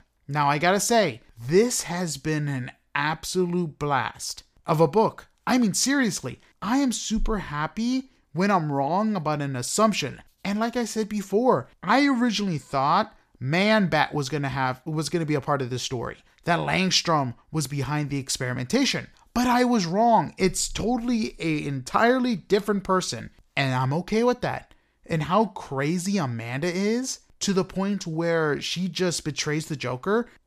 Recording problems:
none

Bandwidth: 15 kHz